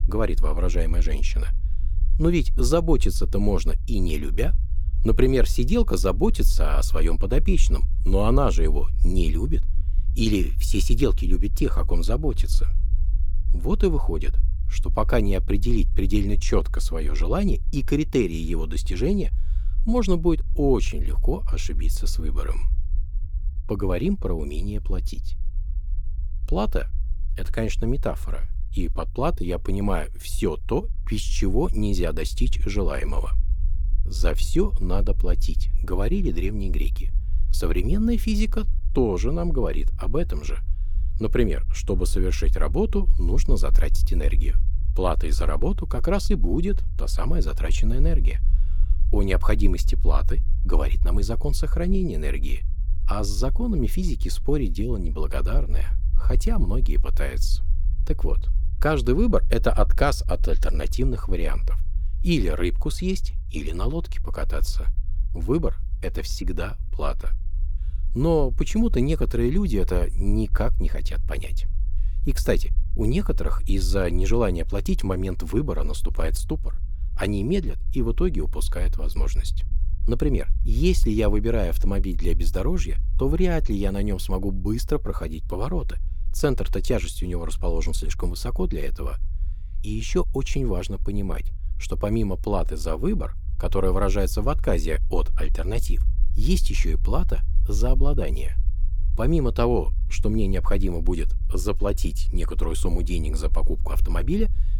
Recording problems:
low rumble; faint; throughout; 20 dB below the speech

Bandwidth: 18.5 kHz